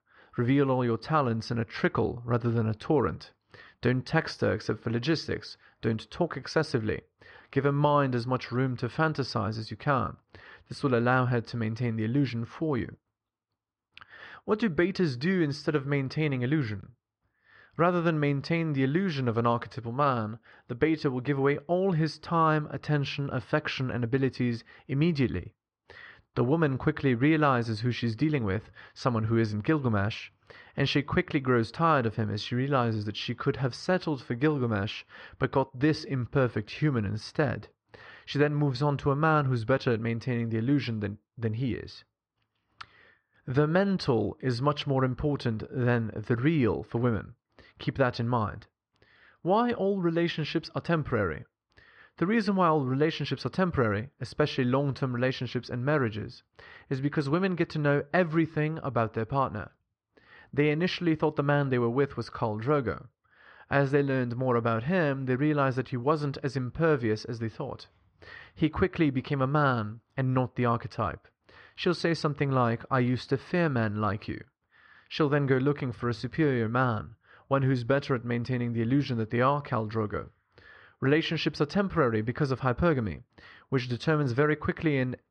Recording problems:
muffled; slightly; fading above 4 kHz

